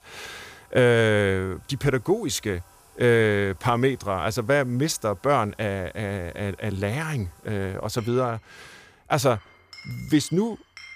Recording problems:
household noises; faint; throughout; 25 dB below the speech

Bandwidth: 15 kHz